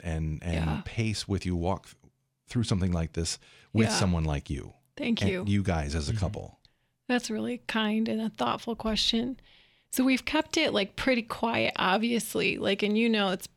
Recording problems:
none

